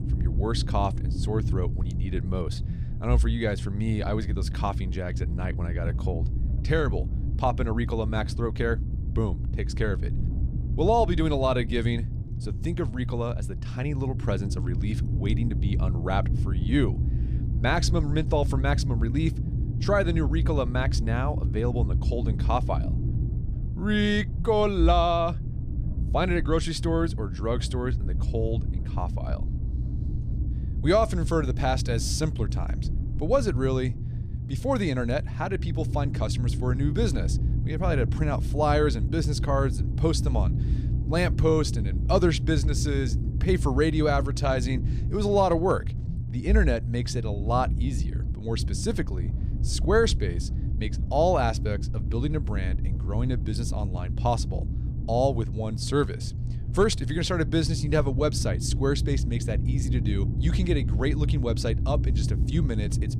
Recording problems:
low rumble; noticeable; throughout; 15 dB below the speech

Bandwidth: 15 kHz